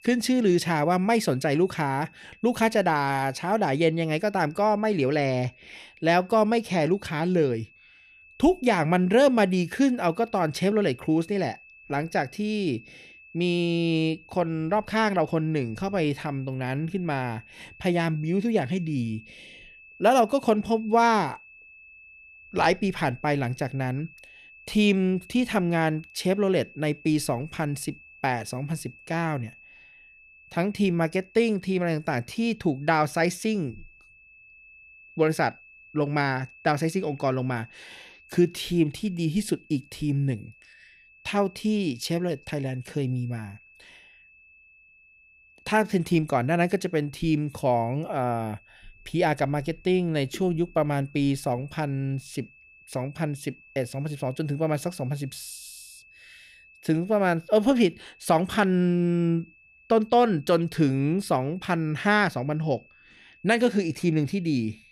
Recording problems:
high-pitched whine; faint; throughout; 2.5 kHz, 25 dB below the speech

